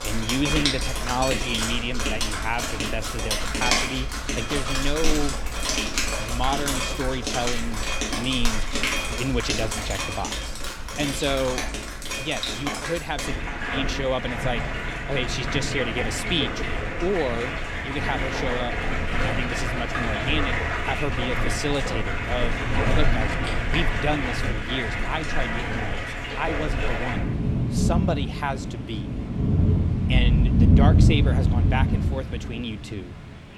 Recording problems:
rain or running water; very loud; throughout; 4 dB above the speech

